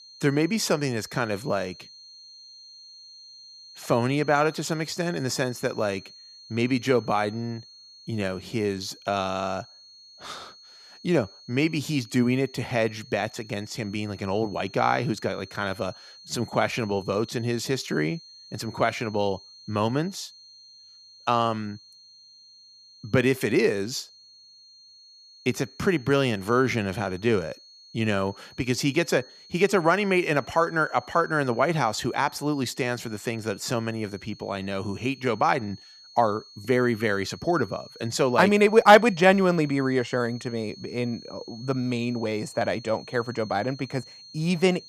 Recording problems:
high-pitched whine; faint; throughout; 4.5 kHz, 20 dB below the speech

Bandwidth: 14.5 kHz